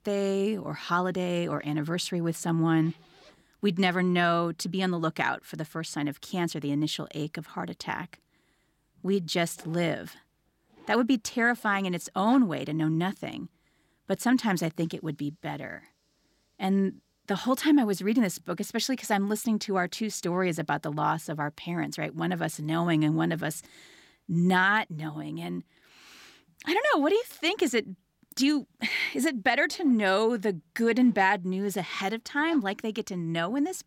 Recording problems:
household noises; faint; throughout; 30 dB below the speech

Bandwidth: 16.5 kHz